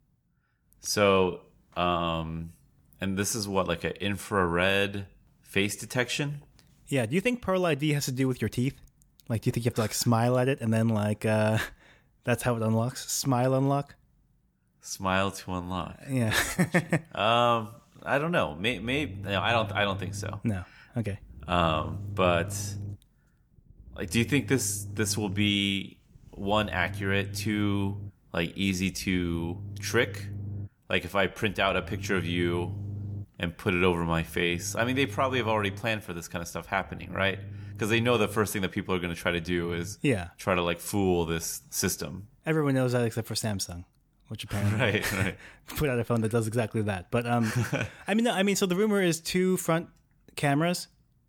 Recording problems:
low rumble; faint; from 19 to 40 s; 25 dB below the speech

